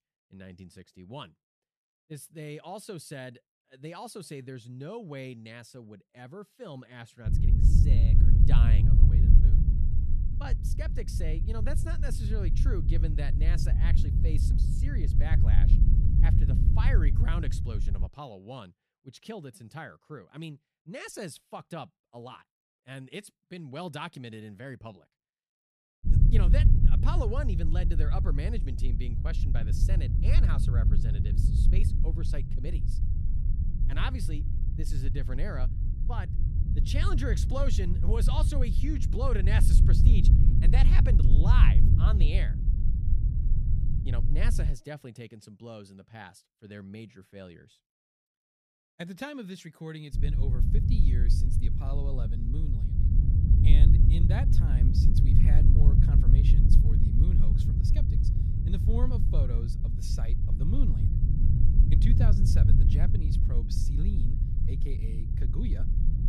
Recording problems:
low rumble; loud; from 7.5 to 18 s, from 26 to 45 s and from 50 s on; 1 dB below the speech

